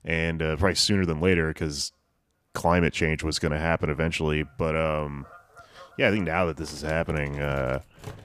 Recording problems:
animal sounds; faint; throughout; 25 dB below the speech

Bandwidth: 15 kHz